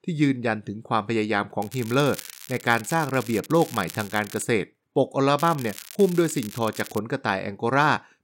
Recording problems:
crackling; noticeable; from 1.5 to 4.5 s and from 5.5 to 7 s; 15 dB below the speech

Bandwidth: 16 kHz